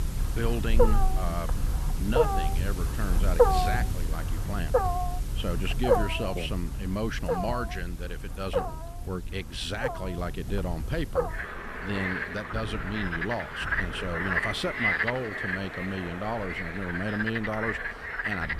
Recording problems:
animal sounds; very loud; throughout; 4 dB above the speech
wind noise on the microphone; occasional gusts; 25 dB below the speech

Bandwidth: 15 kHz